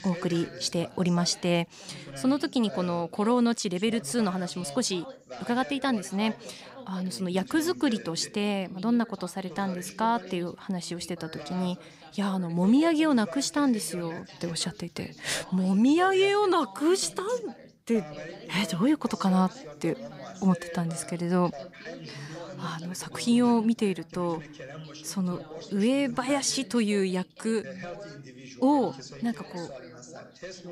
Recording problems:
background chatter; noticeable; throughout; 2 voices, 15 dB below the speech

